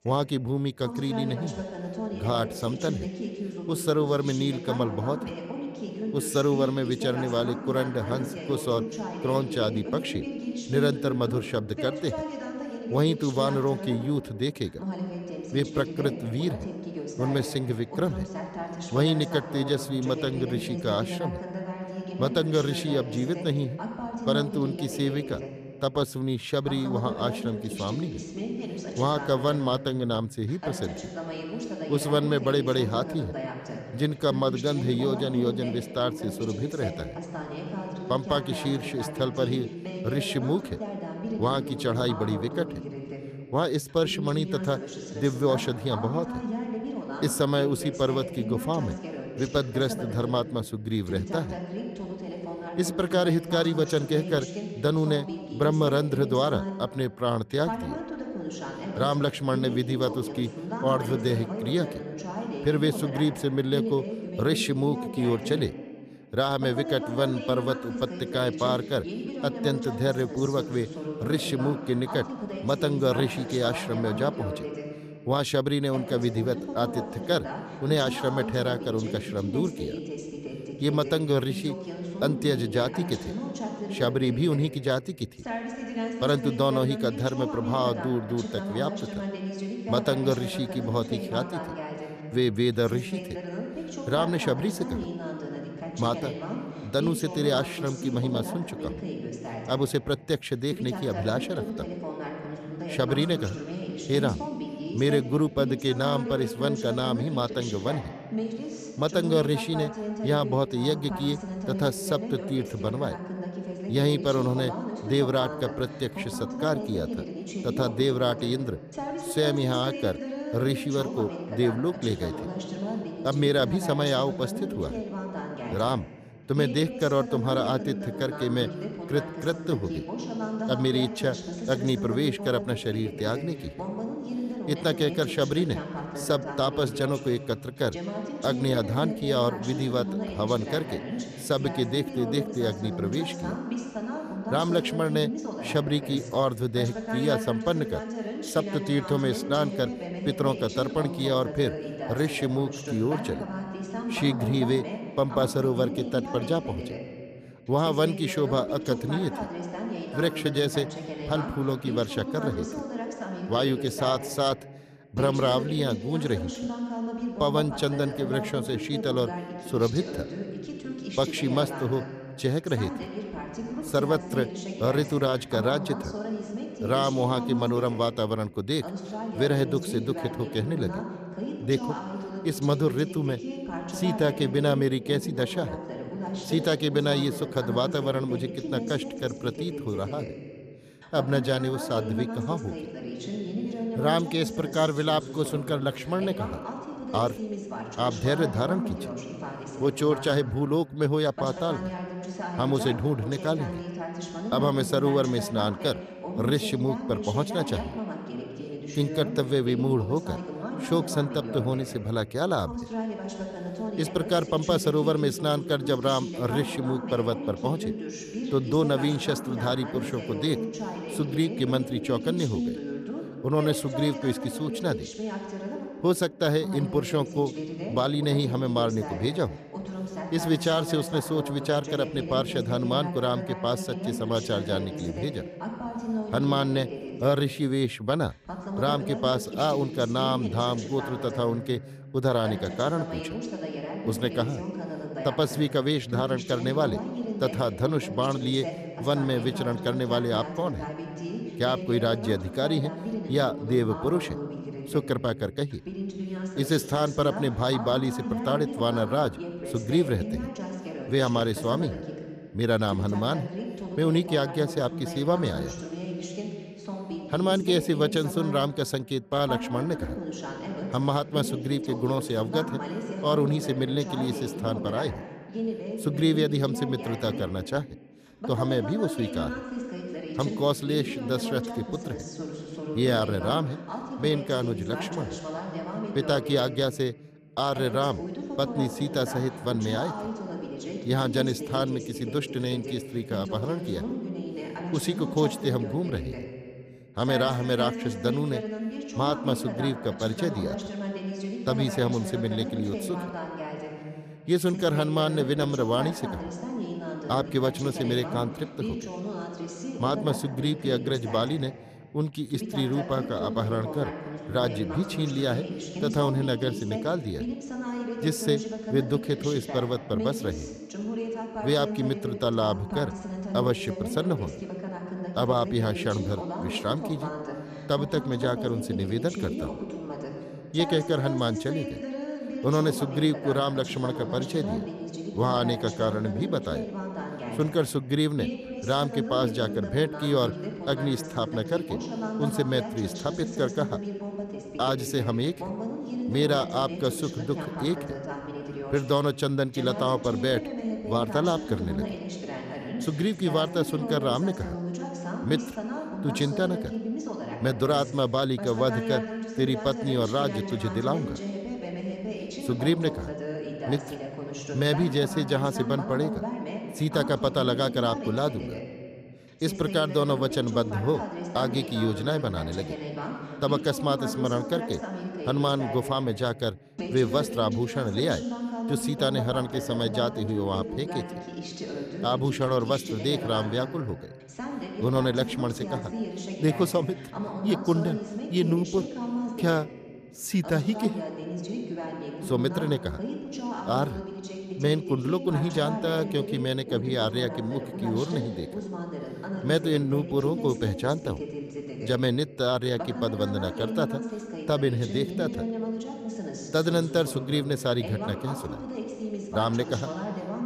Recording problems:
voice in the background; loud; throughout; 7 dB below the speech

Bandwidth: 14.5 kHz